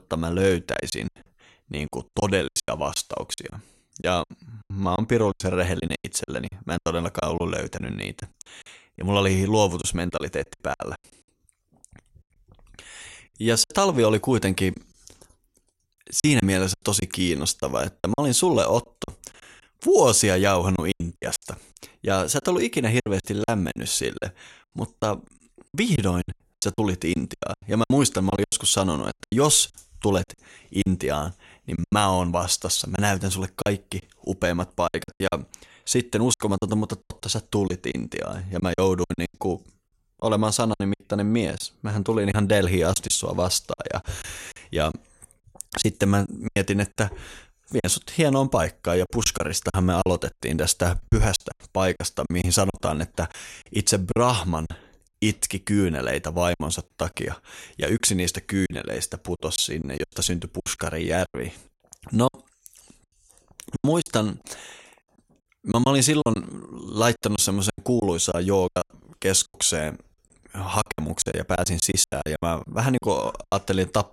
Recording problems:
choppy; very; 12% of the speech affected

